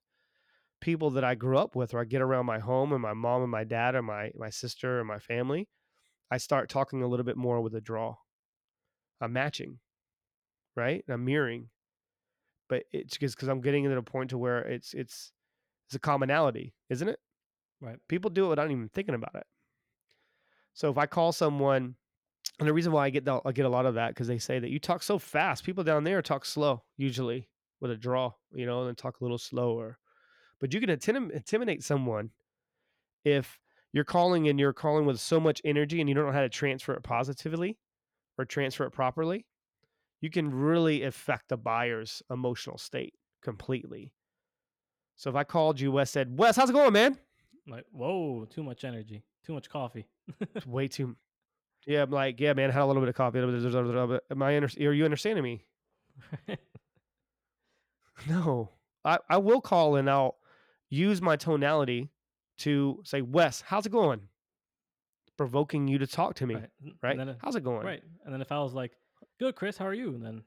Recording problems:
none

